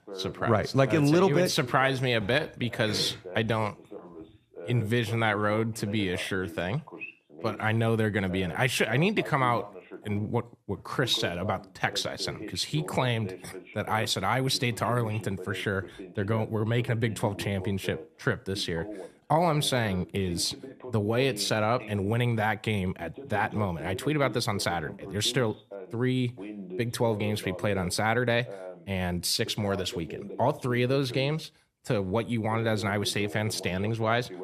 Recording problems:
voice in the background; noticeable; throughout; 15 dB below the speech

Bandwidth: 14.5 kHz